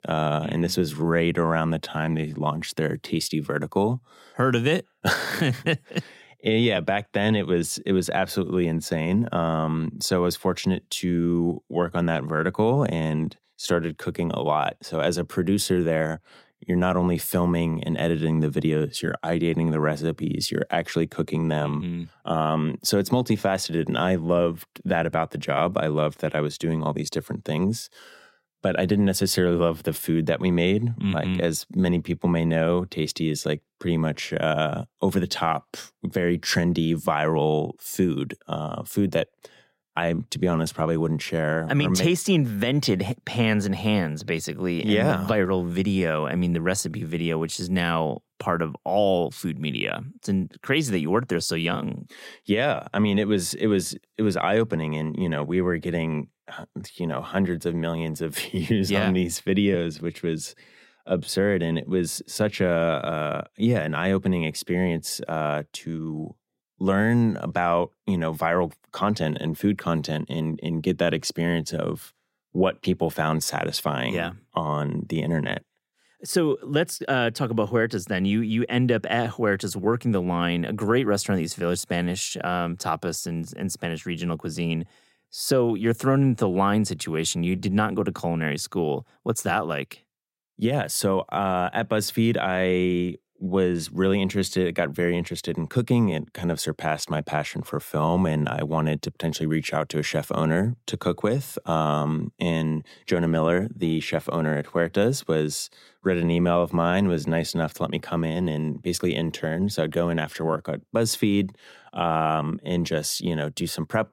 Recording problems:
none

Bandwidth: 16 kHz